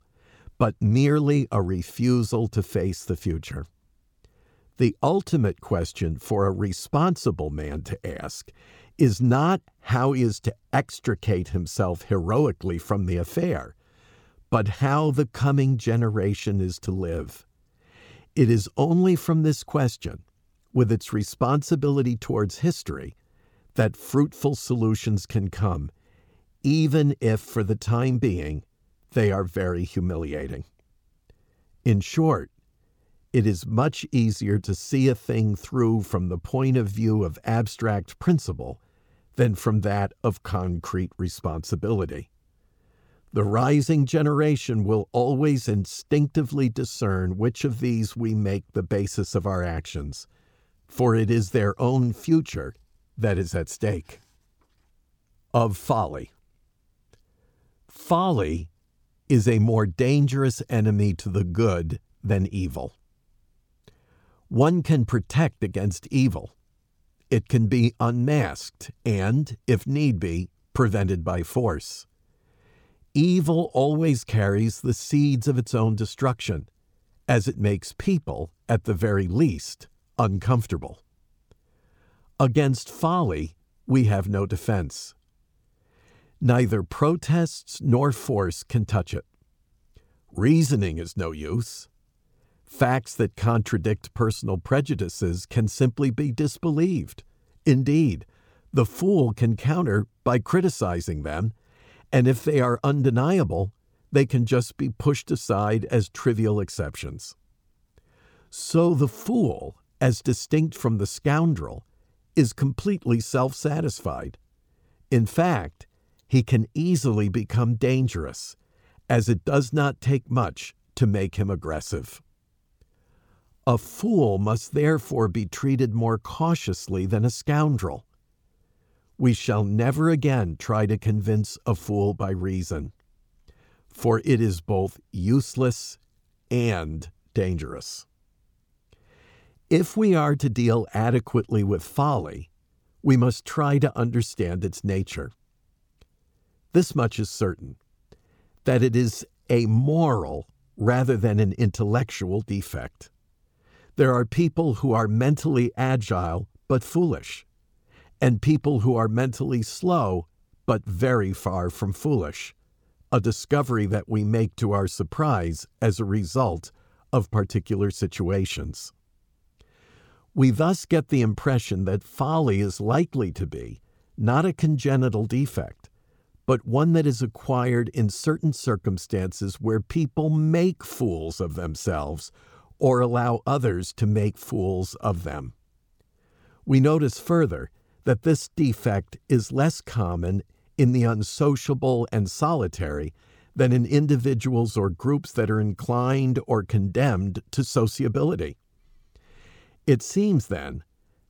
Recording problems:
none

